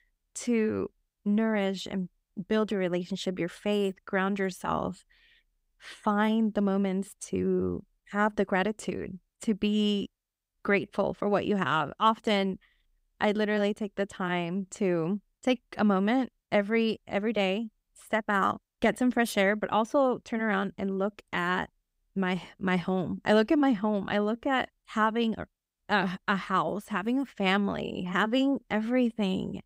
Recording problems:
none

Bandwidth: 15.5 kHz